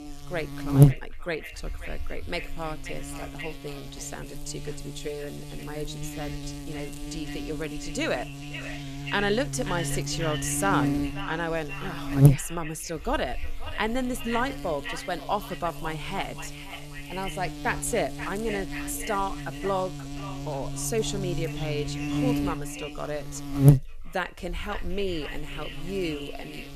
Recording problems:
echo of what is said; strong; throughout; 530 ms later, 10 dB below the speech
electrical hum; loud; throughout; 50 Hz, 5 dB below the speech

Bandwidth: 14 kHz